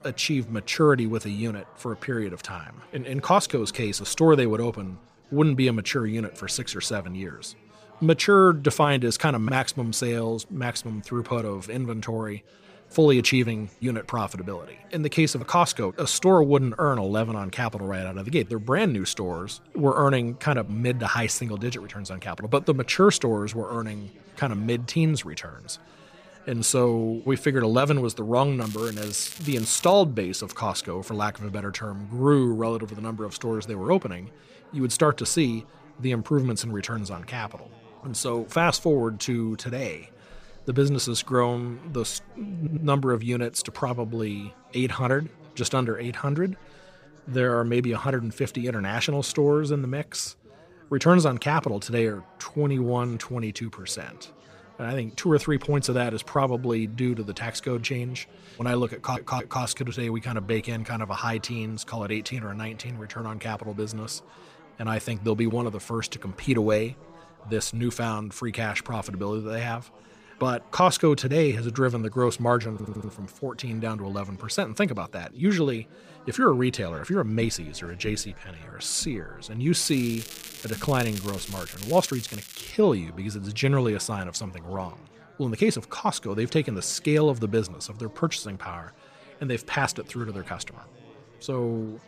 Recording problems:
crackling; noticeable; from 29 to 30 s and from 1:20 to 1:23; 15 dB below the speech
background chatter; faint; throughout; 4 voices, 25 dB below the speech
audio stuttering; at 43 s, at 59 s and at 1:13

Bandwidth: 15 kHz